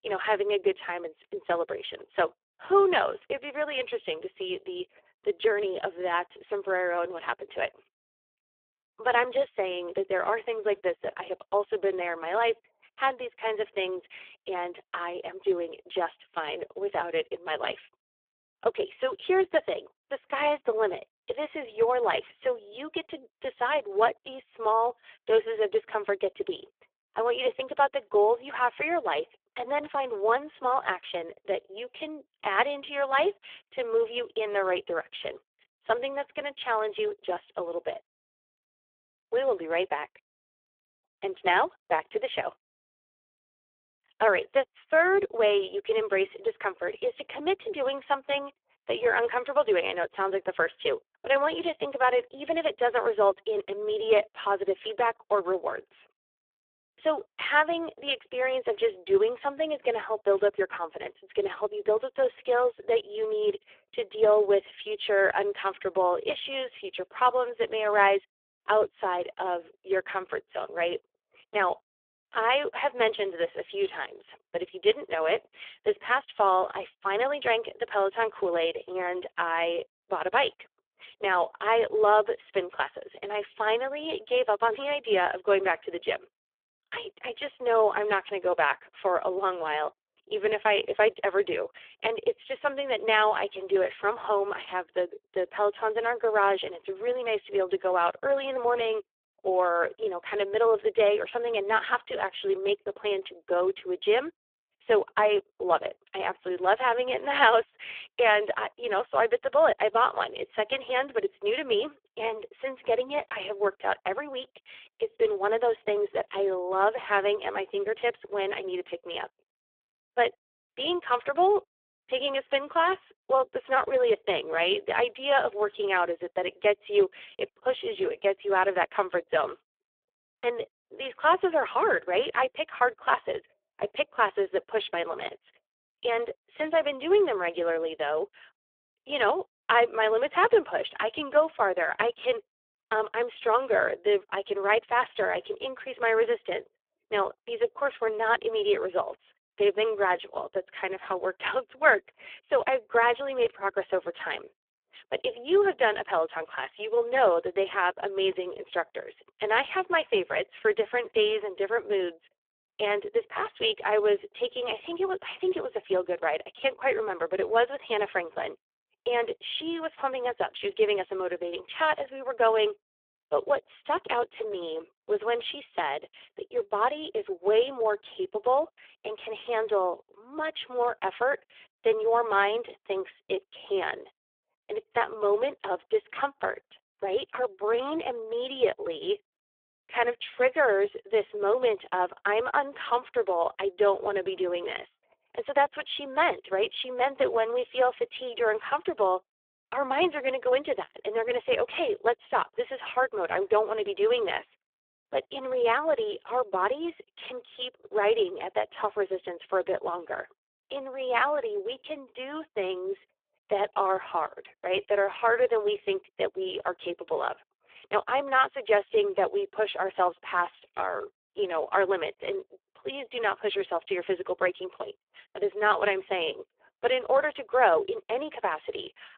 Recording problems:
phone-call audio; poor line

